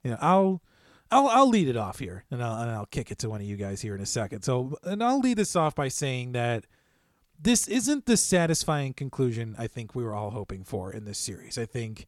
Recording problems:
none

